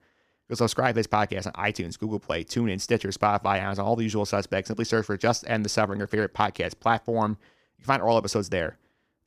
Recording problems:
none

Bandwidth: 15 kHz